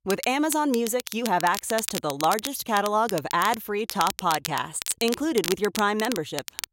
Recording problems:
crackle, like an old record; loud; 9 dB below the speech

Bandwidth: 16 kHz